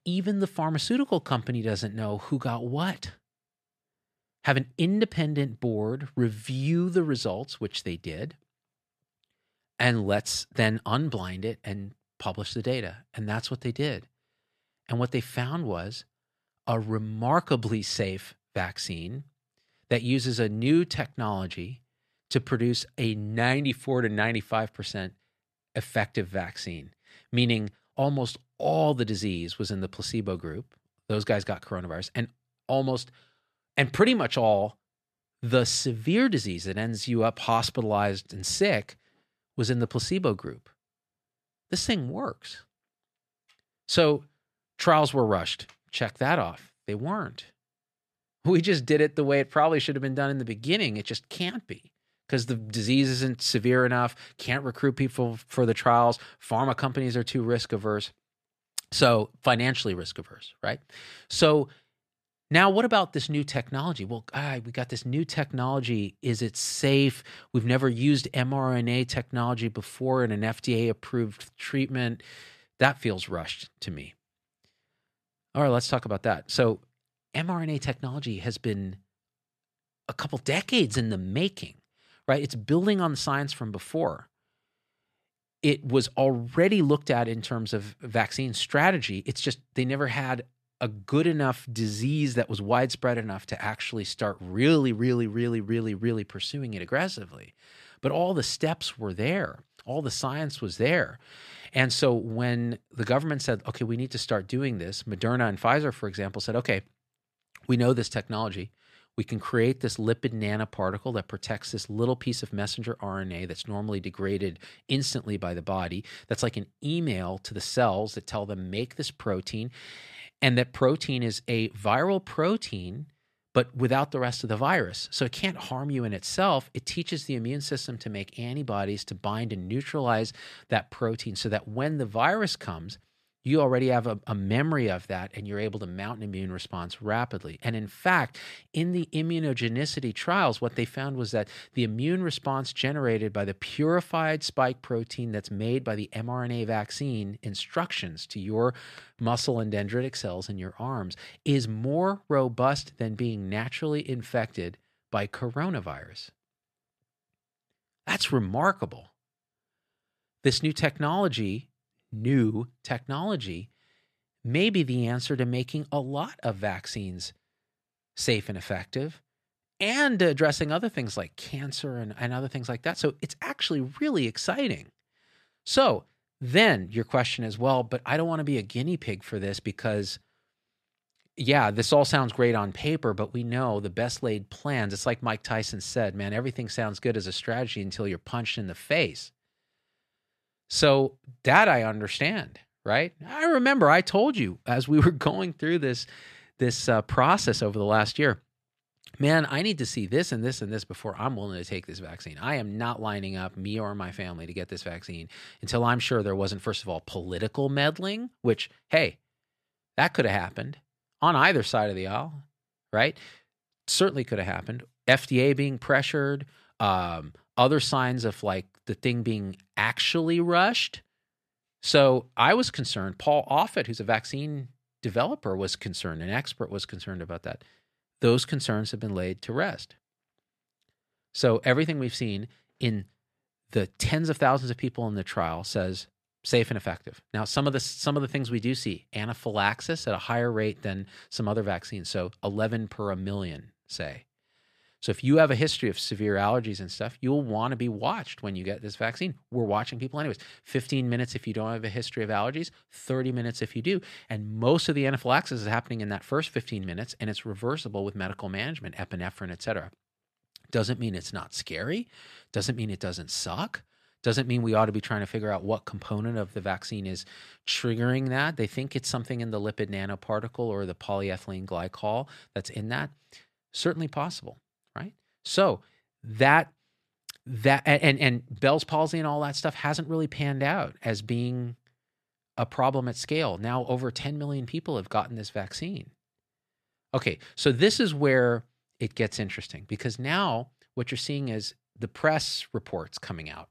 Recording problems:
none

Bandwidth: 14.5 kHz